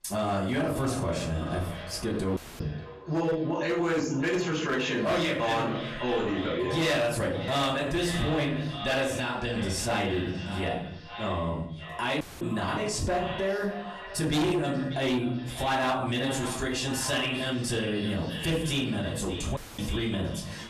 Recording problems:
echo of what is said; strong; throughout; 590 ms later, 10 dB below the speech
off-mic speech; far
room echo; slight; dies away in 0.4 s
distortion; slight; 6% of the sound clipped
squashed, flat; somewhat
audio cutting out; at 2.5 s, at 12 s and at 20 s

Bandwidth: 14.5 kHz